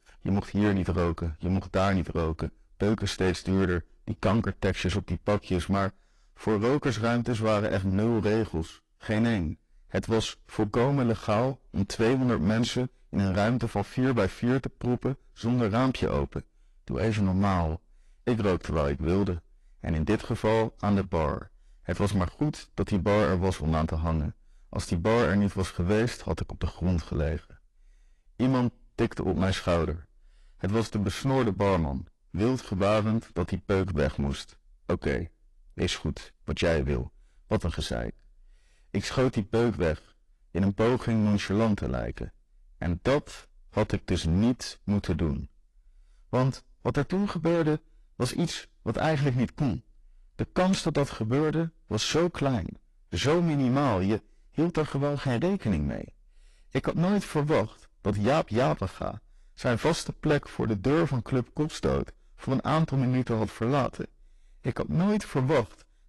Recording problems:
distortion; heavy; 10% of the sound clipped
garbled, watery; slightly

